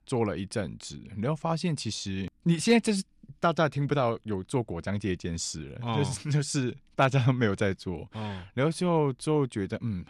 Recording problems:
none

